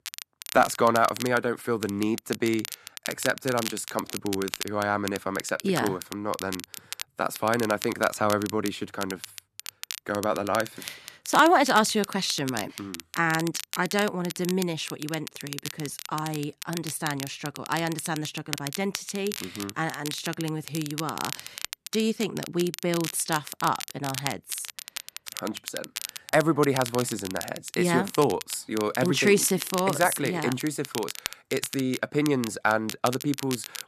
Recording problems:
crackle, like an old record; loud; 10 dB below the speech

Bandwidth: 14 kHz